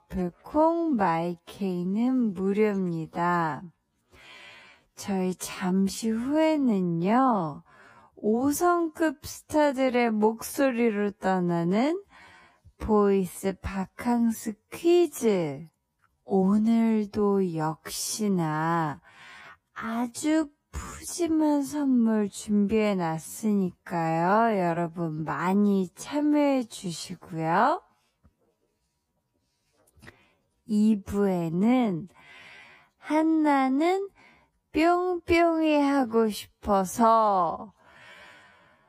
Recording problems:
wrong speed, natural pitch; too slow; 0.5 times normal speed

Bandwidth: 15 kHz